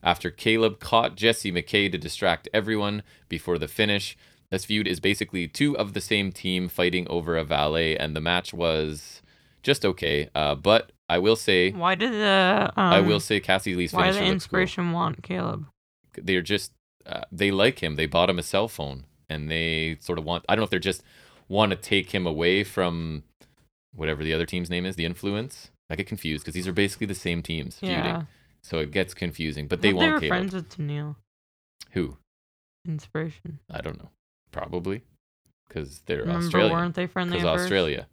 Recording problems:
uneven, jittery; strongly; from 4.5 to 36 s

